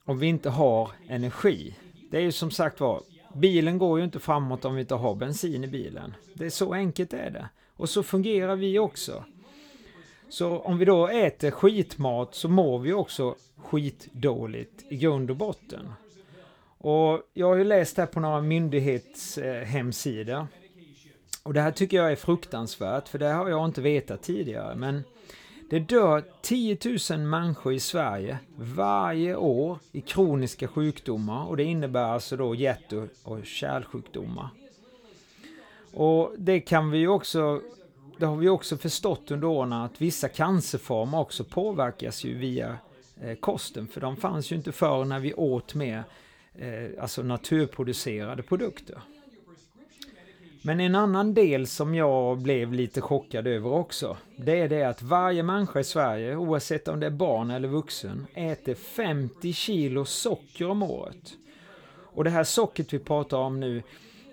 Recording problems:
voice in the background; faint; throughout; 25 dB below the speech

